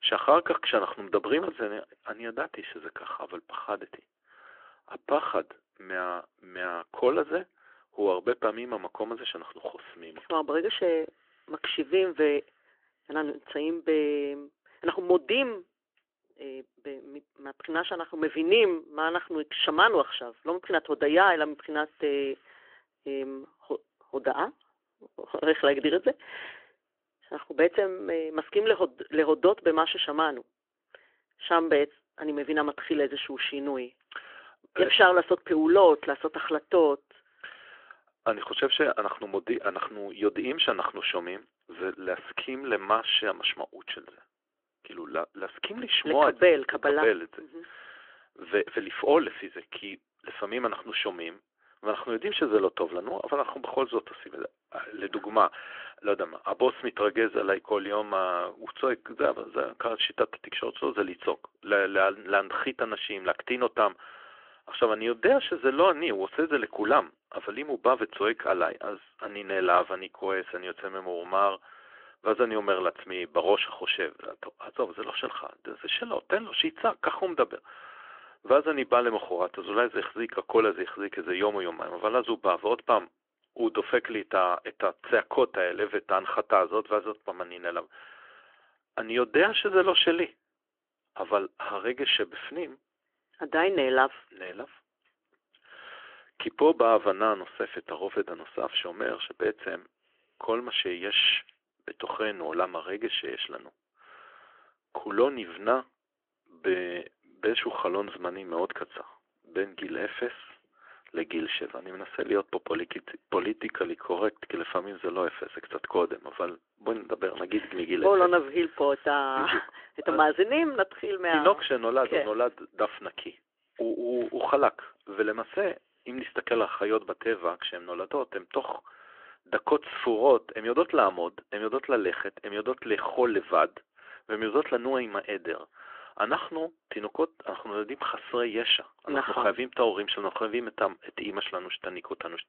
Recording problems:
phone-call audio; nothing above 3.5 kHz
muffled; very slightly; fading above 3.5 kHz

